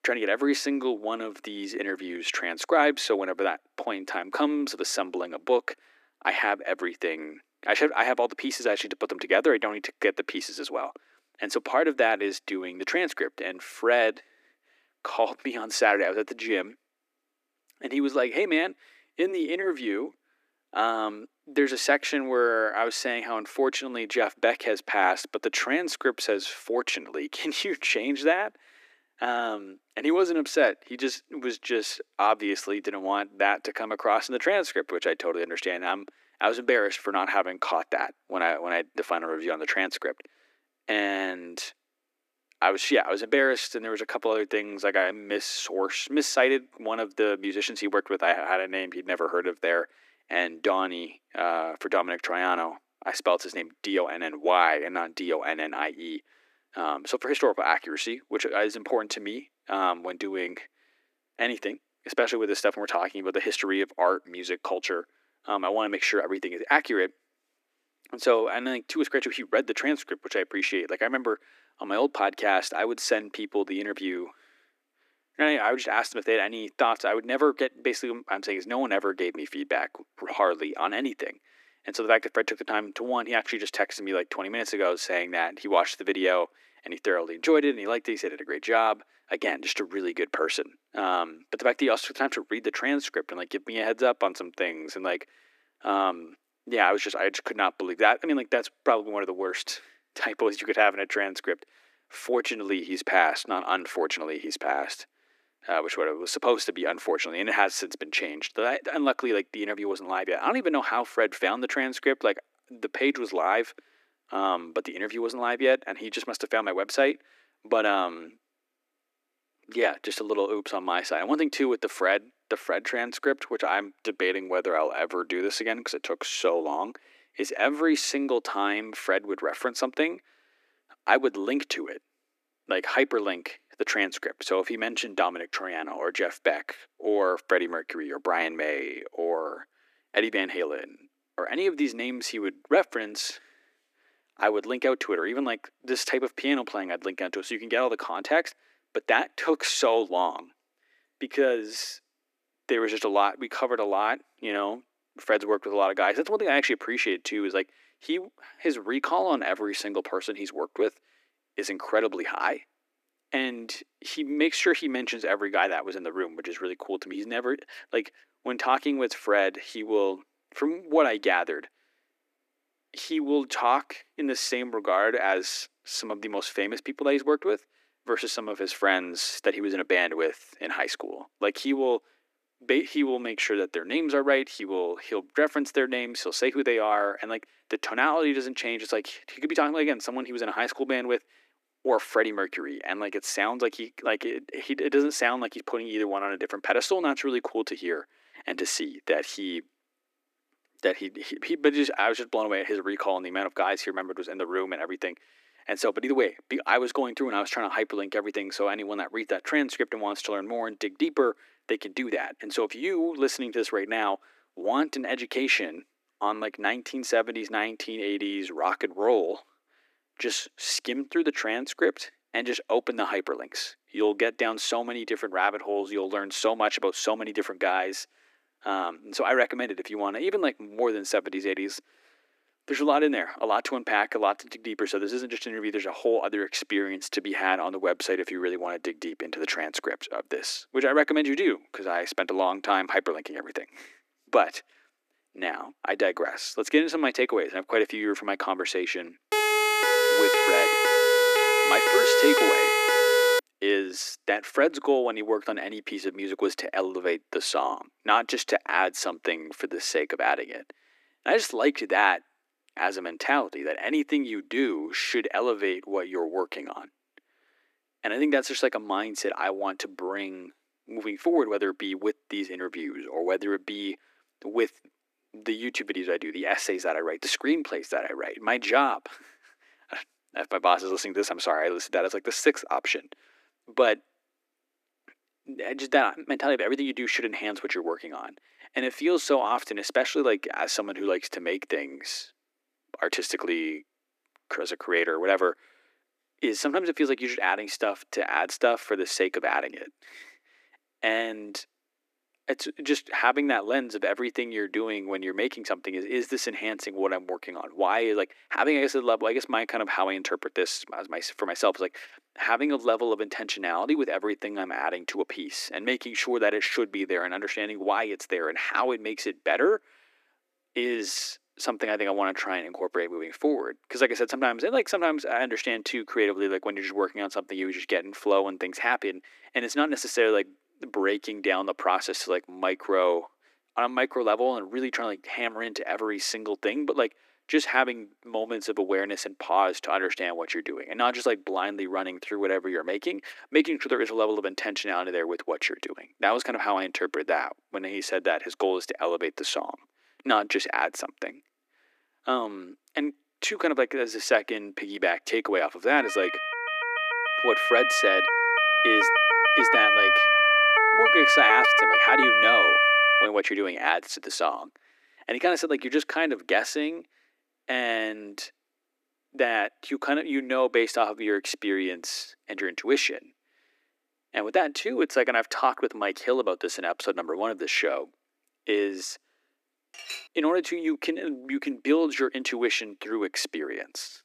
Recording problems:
thin; somewhat; fading below 300 Hz
siren; loud; from 4:09 to 4:13 and from 5:56 to 6:03; peak 10 dB above the speech
clattering dishes; noticeable; at 6:20; peak 10 dB below the speech

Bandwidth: 14.5 kHz